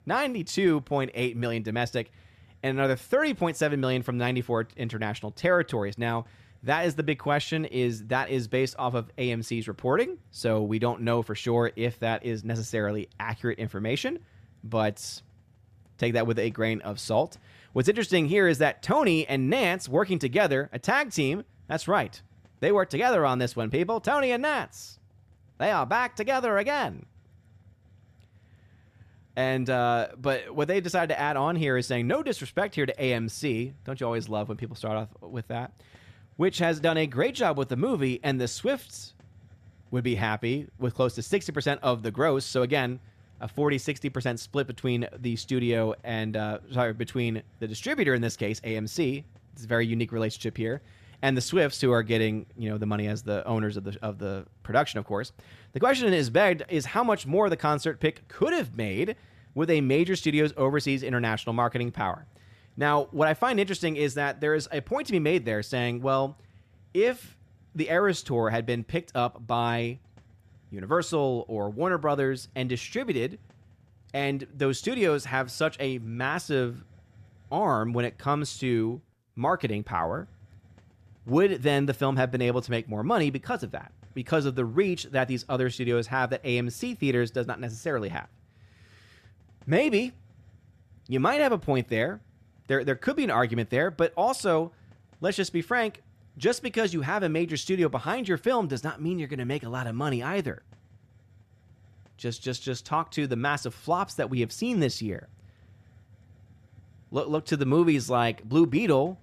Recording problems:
hiss; faint; throughout; 30 dB below the speech

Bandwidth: 14.5 kHz